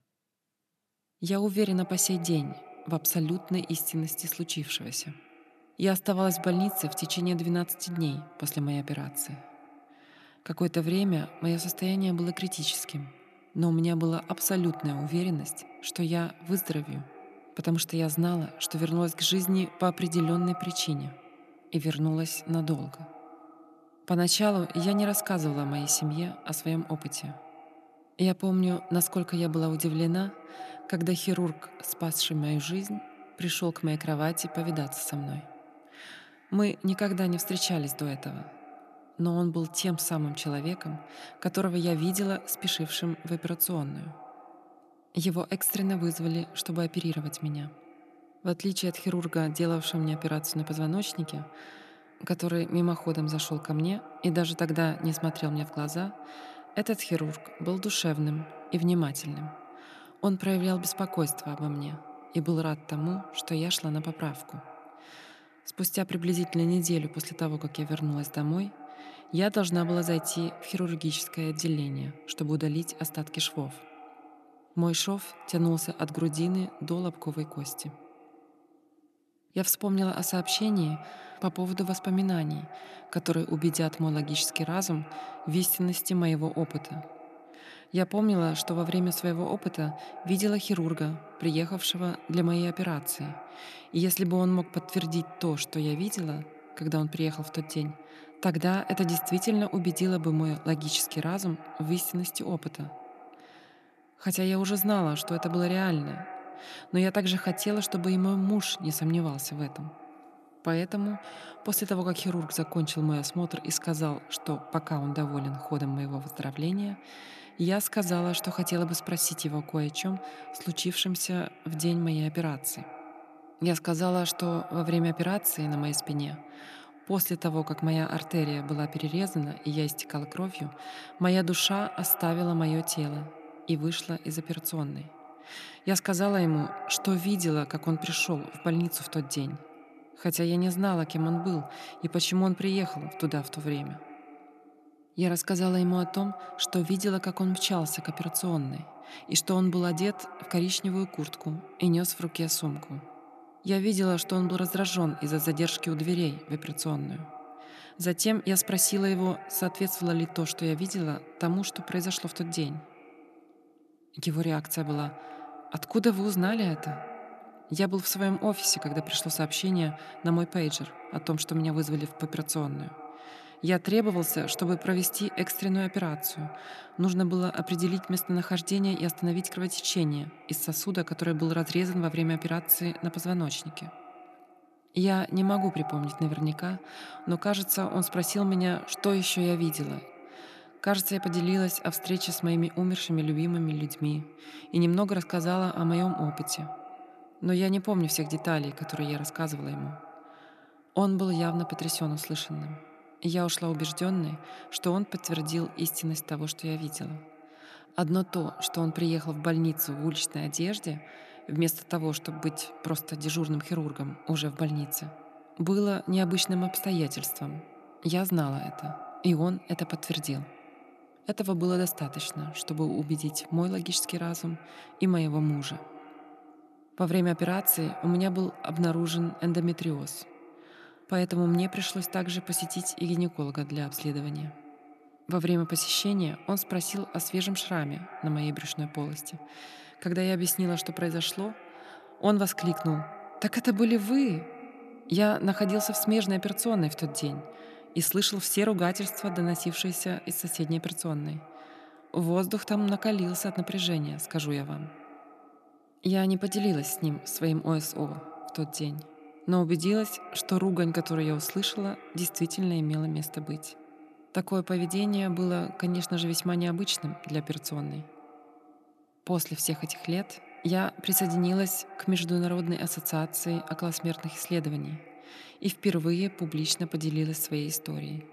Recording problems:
echo of what is said; noticeable; throughout; 140 ms later, 15 dB below the speech

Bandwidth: 13.5 kHz